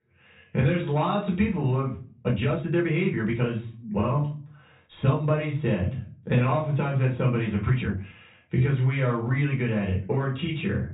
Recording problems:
off-mic speech; far
high frequencies cut off; severe; nothing above 4 kHz
room echo; slight; dies away in 0.3 s
uneven, jittery; strongly; from 2 to 9.5 s

